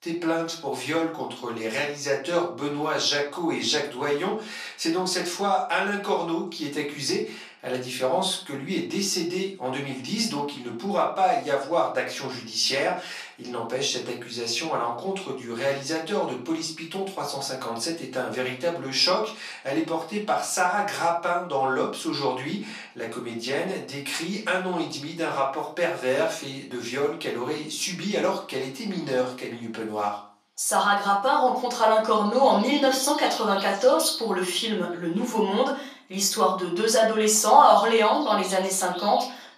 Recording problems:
off-mic speech; far
thin; somewhat; fading below 500 Hz
room echo; slight; dies away in 0.4 s
animal sounds; very faint; throughout; 10 dB below the speech

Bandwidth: 14 kHz